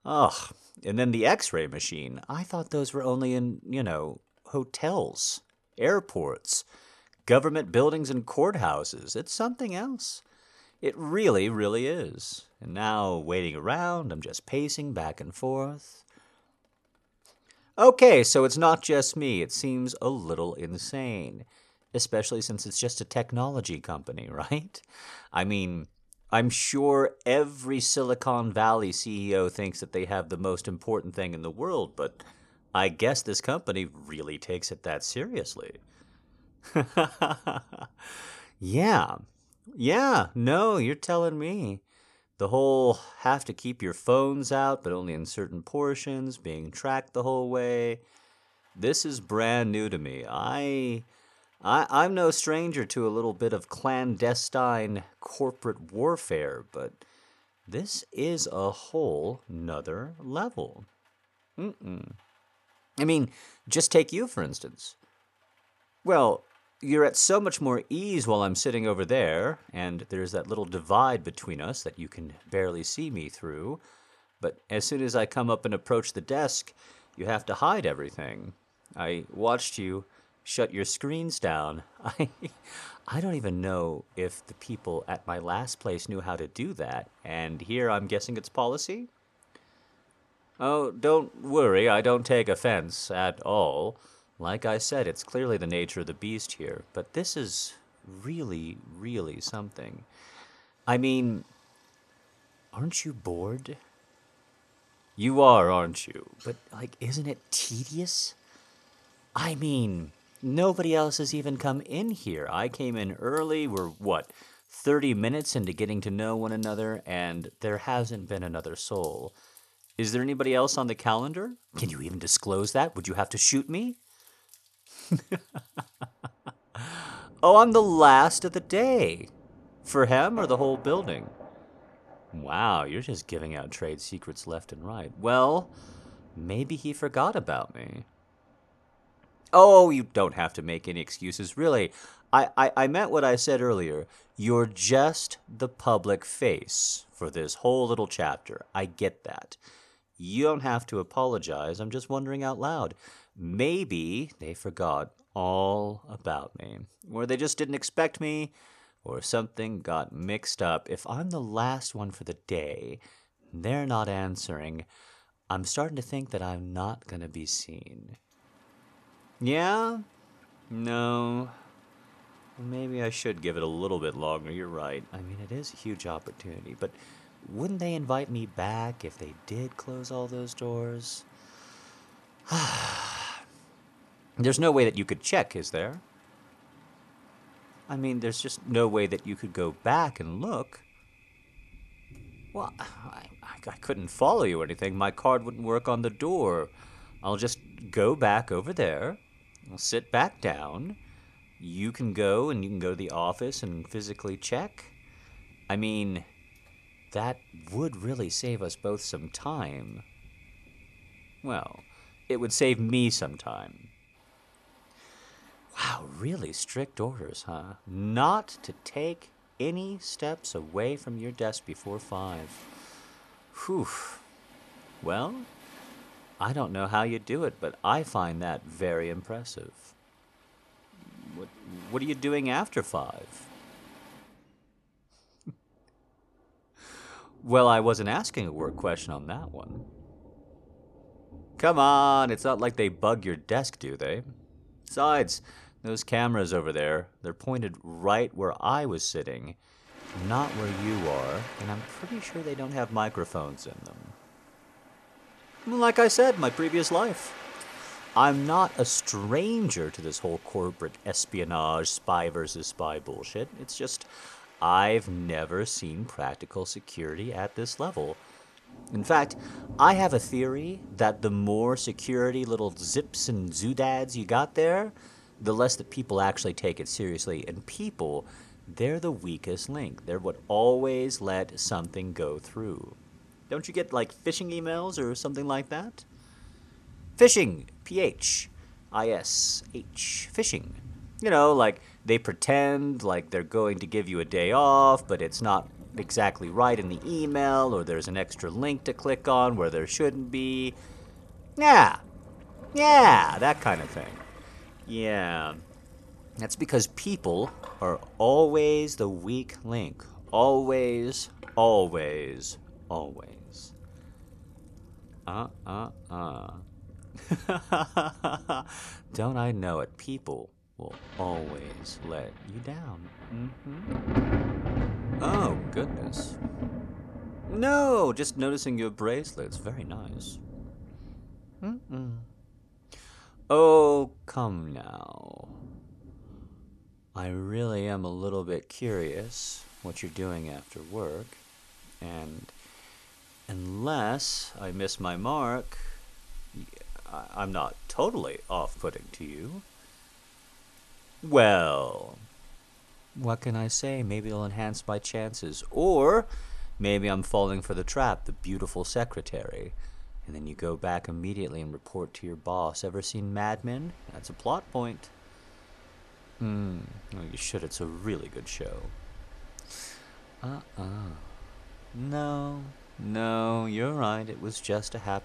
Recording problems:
rain or running water; noticeable; throughout; 20 dB below the speech

